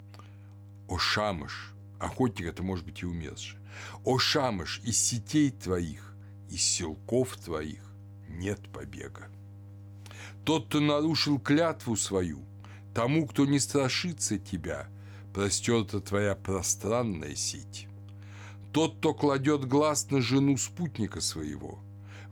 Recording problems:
electrical hum; faint; throughout; 50 Hz, 30 dB below the speech

